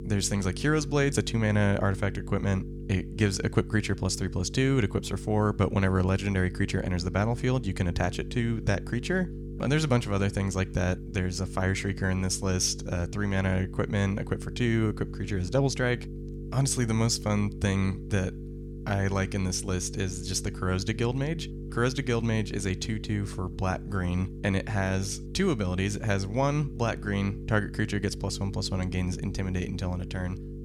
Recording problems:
electrical hum; noticeable; throughout; 50 Hz, 15 dB below the speech

